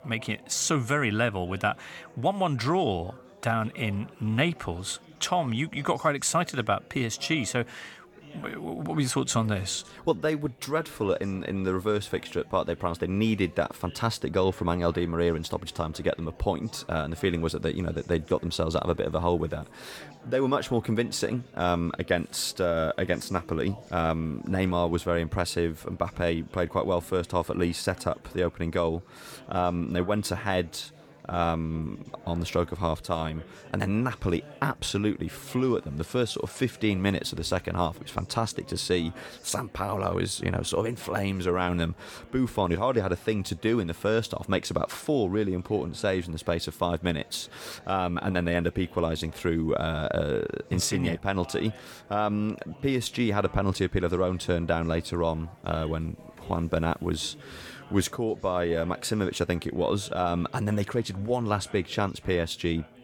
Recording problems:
chatter from many people; faint; throughout; 20 dB below the speech

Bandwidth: 17.5 kHz